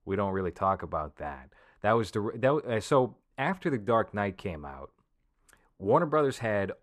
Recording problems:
muffled; slightly; fading above 2 kHz

